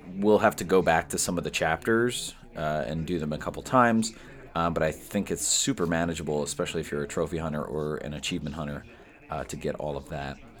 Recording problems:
chatter from many people; faint; throughout; 25 dB below the speech

